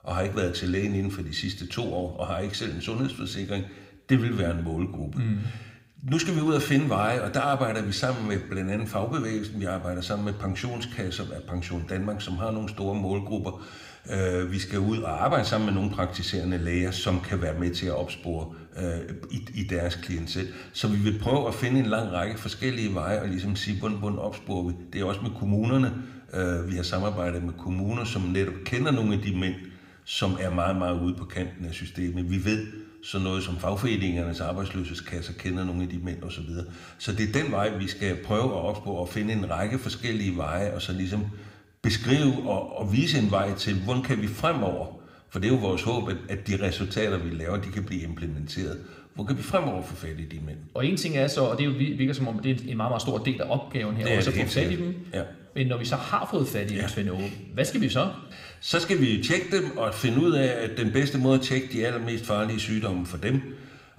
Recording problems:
room echo; very slight; dies away in 0.8 s

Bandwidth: 15.5 kHz